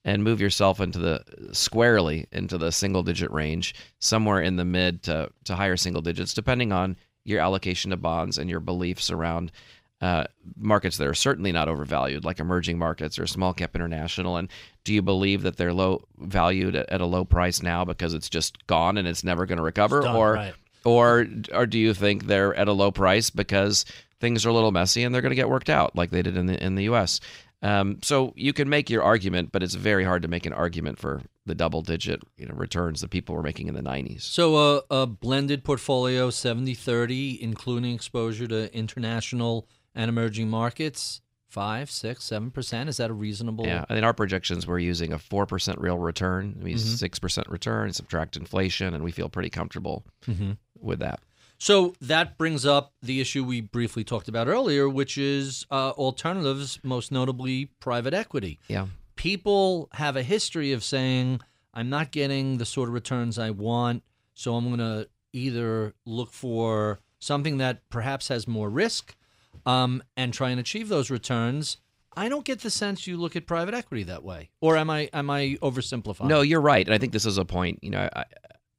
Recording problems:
none

